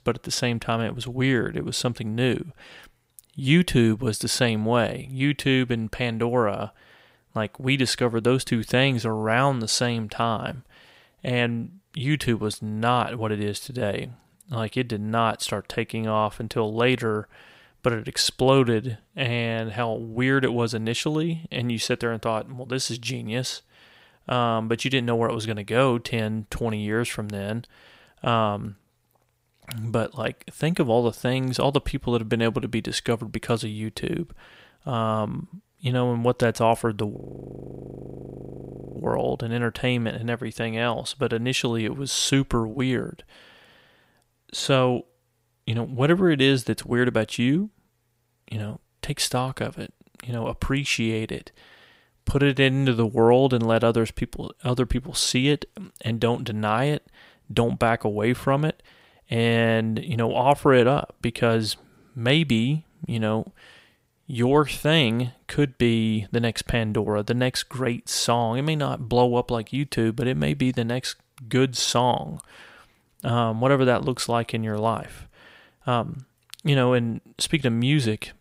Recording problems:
audio freezing; at 37 s for 2 s

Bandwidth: 15.5 kHz